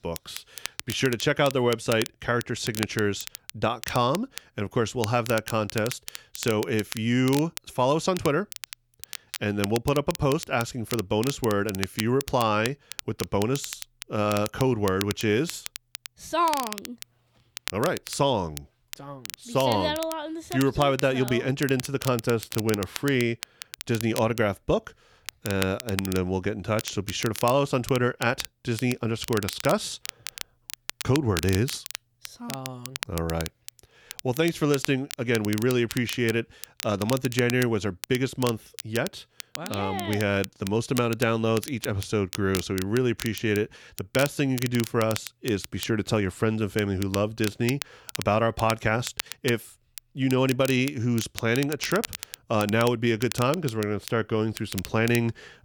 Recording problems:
crackle, like an old record; noticeable; 10 dB below the speech

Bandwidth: 19 kHz